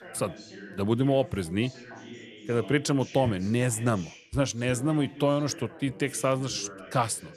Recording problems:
background chatter; noticeable; throughout; 2 voices, 15 dB below the speech

